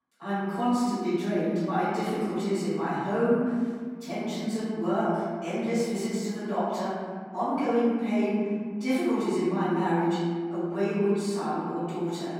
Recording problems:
room echo; strong; dies away in 1.8 s
off-mic speech; far

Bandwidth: 16.5 kHz